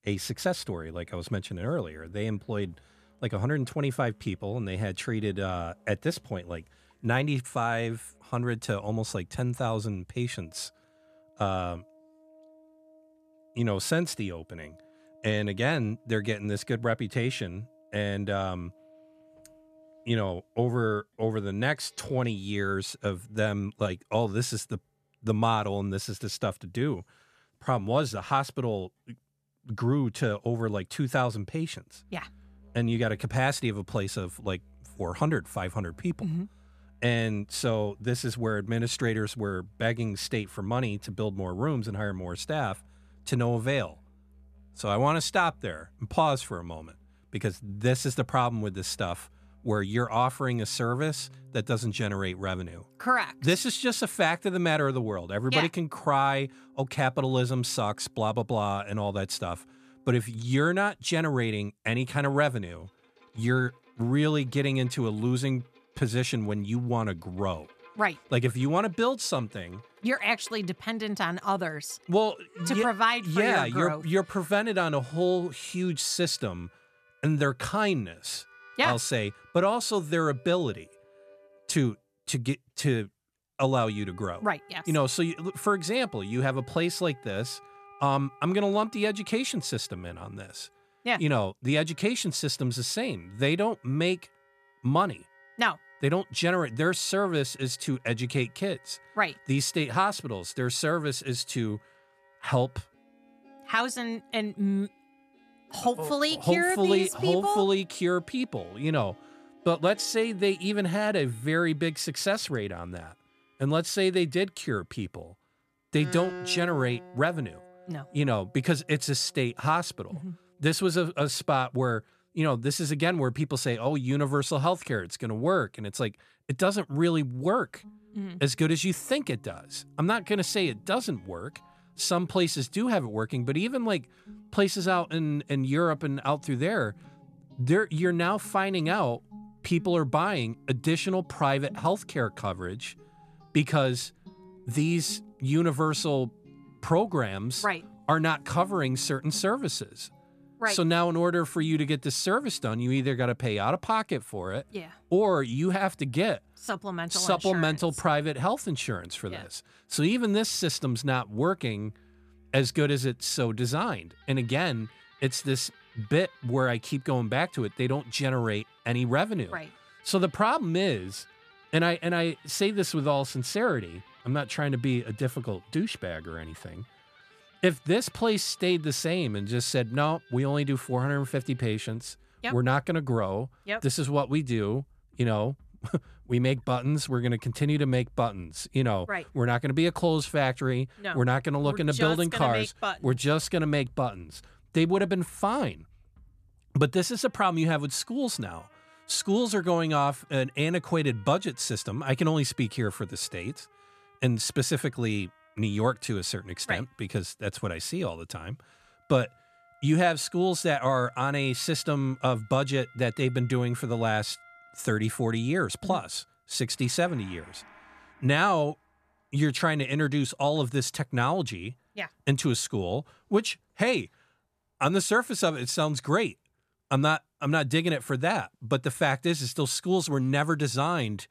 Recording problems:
background music; faint; throughout; 25 dB below the speech

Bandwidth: 14 kHz